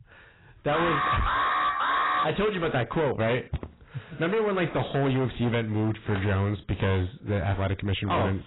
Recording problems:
distortion; heavy; 20% of the sound clipped
garbled, watery; badly; nothing above 4 kHz
alarm; loud; from 0.5 to 2.5 s; peak 3 dB above the speech
footsteps; faint; at 3.5 s; peak 10 dB below the speech

